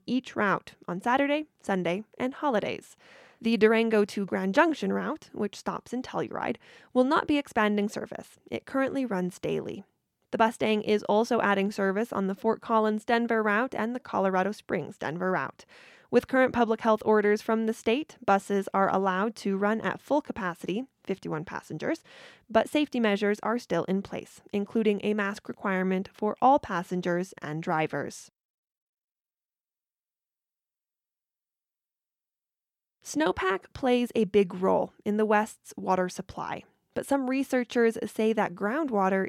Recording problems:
abrupt cut into speech; at the end

